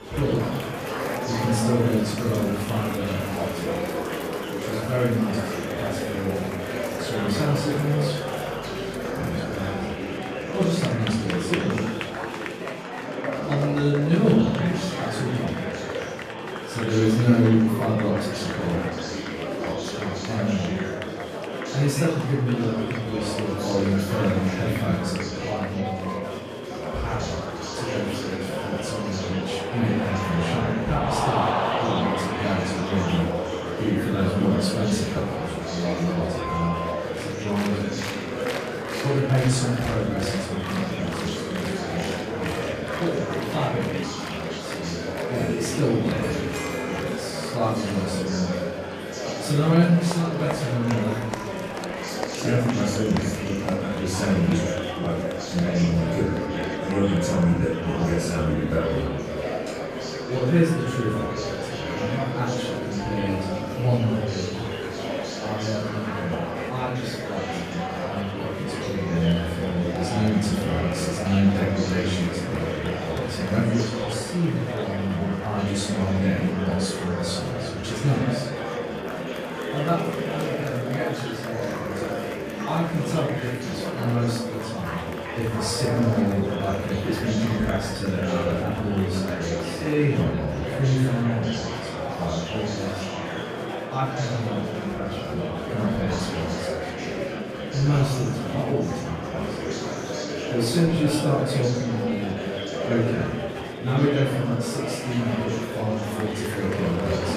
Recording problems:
off-mic speech; far
room echo; noticeable; dies away in 0.7 s
murmuring crowd; loud; throughout; 4 dB below the speech
background music; noticeable; throughout; 15 dB below the speech

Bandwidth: 14.5 kHz